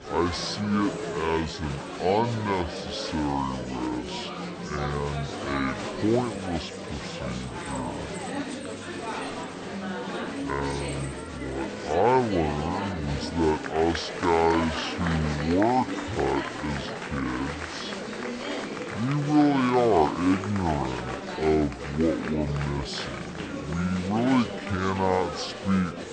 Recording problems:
wrong speed and pitch; too slow and too low; 0.6 times normal speed
chatter from many people; loud; throughout; 6 dB below the speech

